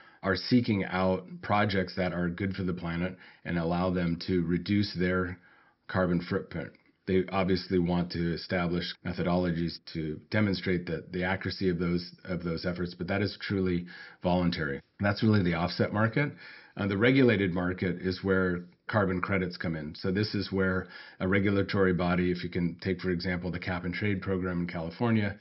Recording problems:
high frequencies cut off; noticeable; nothing above 5.5 kHz

